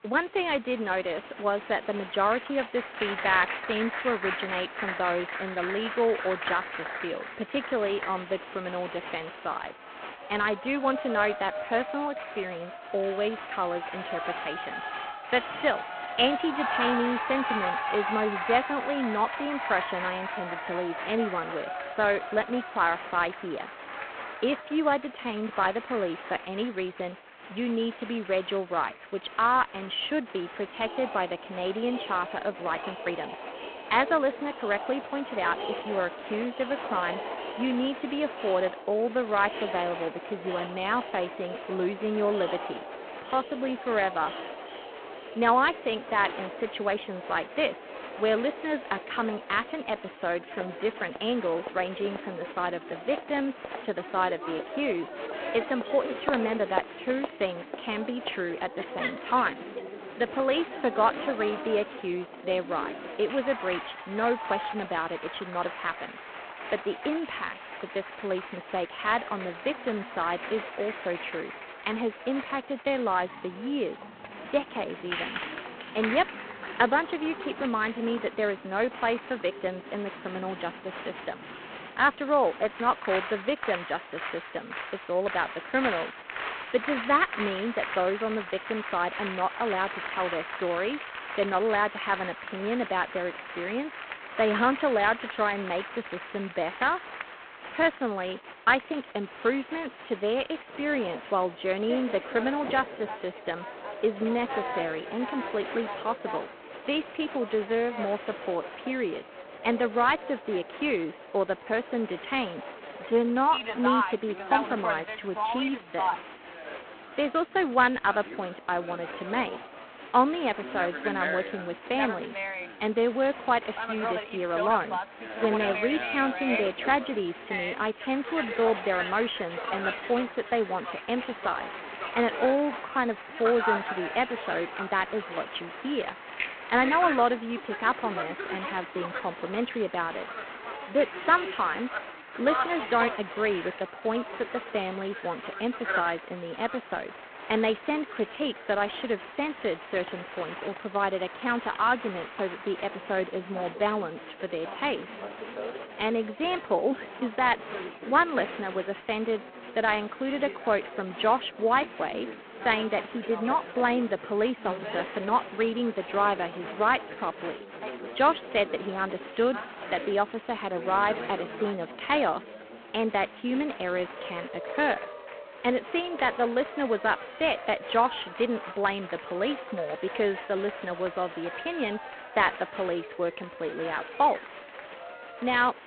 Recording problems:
phone-call audio; poor line
crowd noise; loud; throughout; 8 dB below the speech
uneven, jittery; strongly; from 33 s to 2:59

